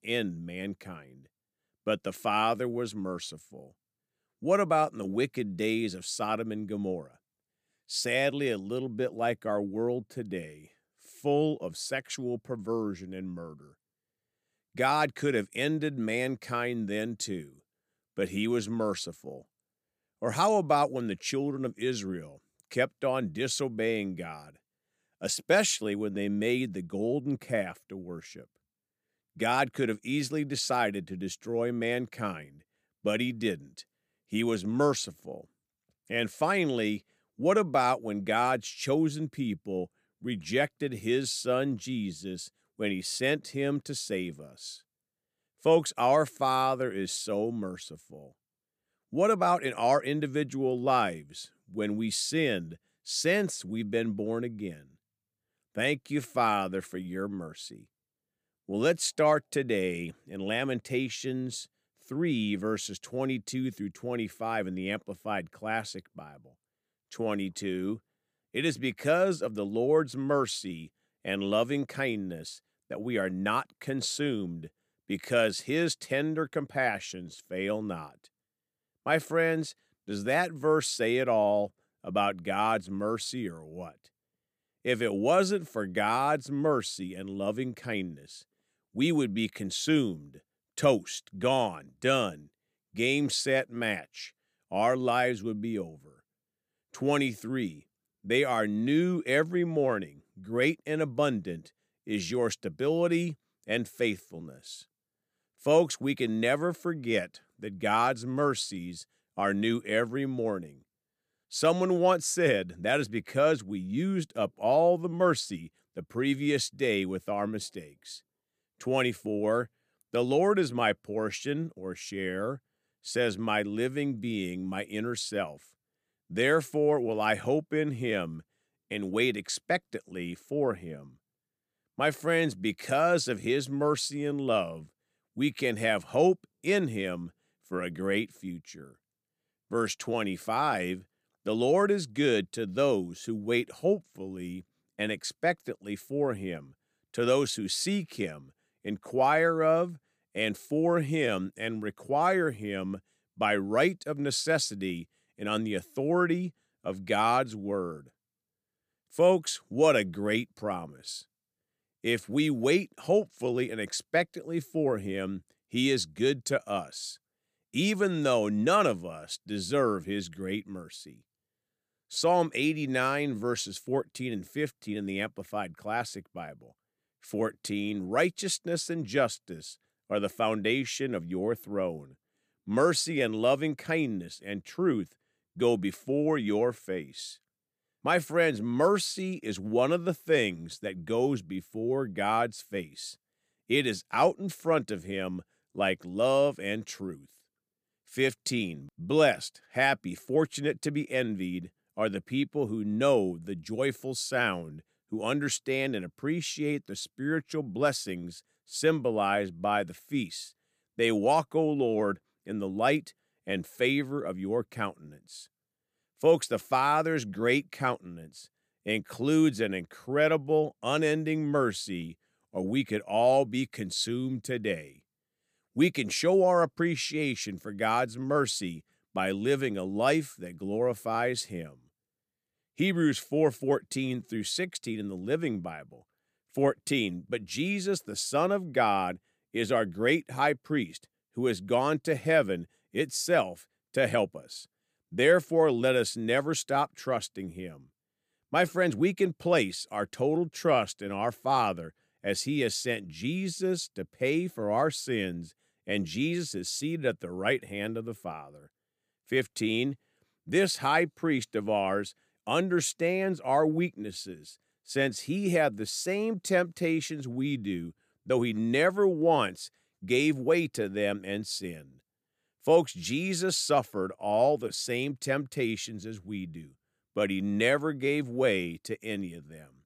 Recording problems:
none

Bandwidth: 15 kHz